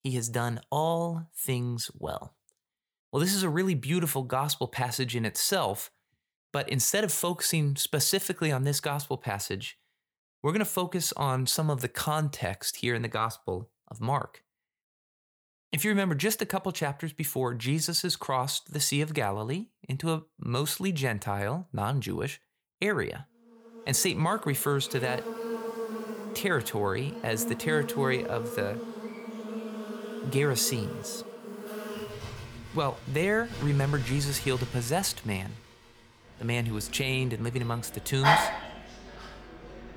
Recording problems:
animal sounds; loud; from 24 s on; 7 dB below the speech

